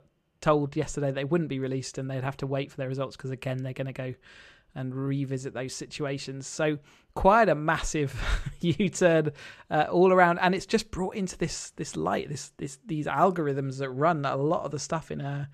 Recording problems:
none

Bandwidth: 14.5 kHz